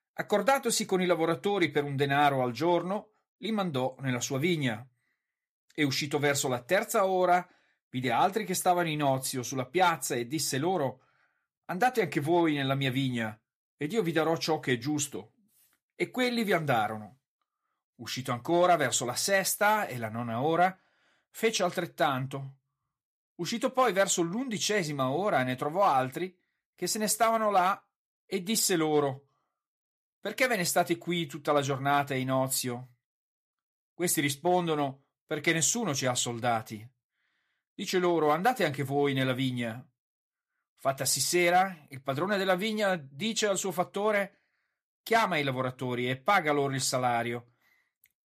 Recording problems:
none

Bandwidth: 14.5 kHz